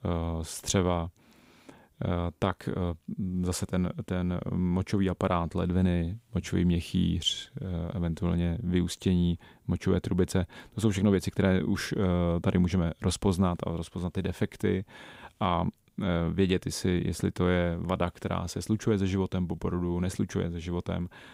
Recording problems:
none

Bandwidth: 15.5 kHz